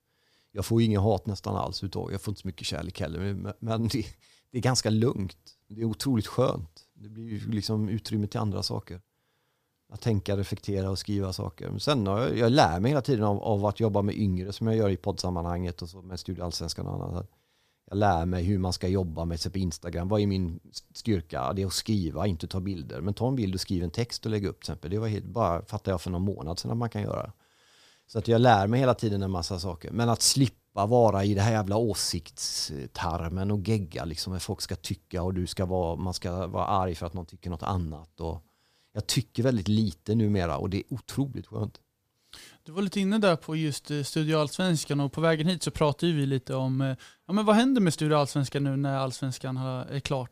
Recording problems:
none

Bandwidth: 15 kHz